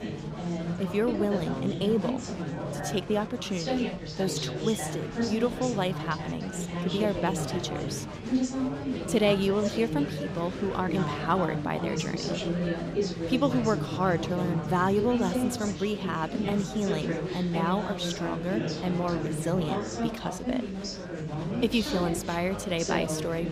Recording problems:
chatter from many people; loud; throughout; 2 dB below the speech

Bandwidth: 15.5 kHz